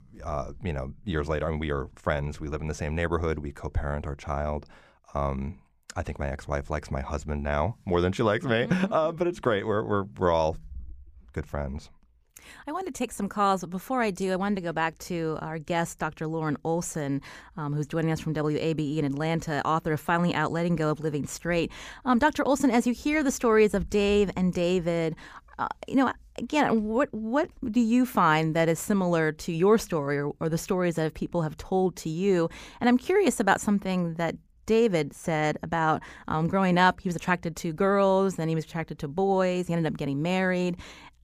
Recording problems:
none

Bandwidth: 15 kHz